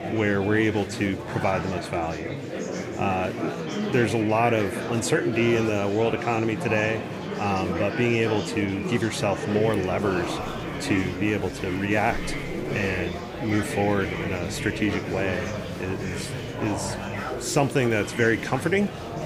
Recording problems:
murmuring crowd; loud; throughout; 5 dB below the speech

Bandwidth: 15.5 kHz